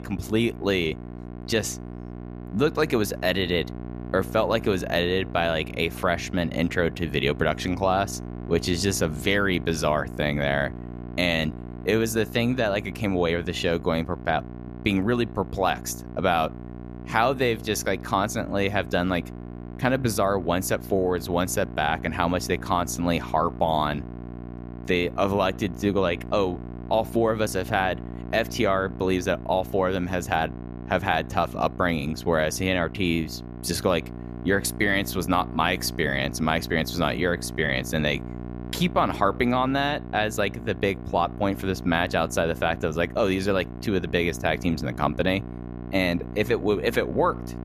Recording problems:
electrical hum; noticeable; throughout; 60 Hz, 20 dB below the speech

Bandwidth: 14.5 kHz